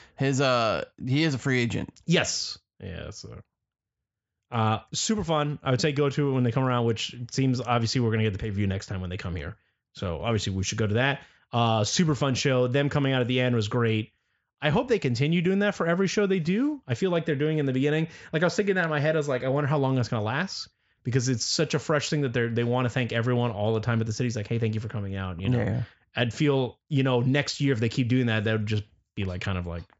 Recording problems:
high frequencies cut off; noticeable; nothing above 8 kHz

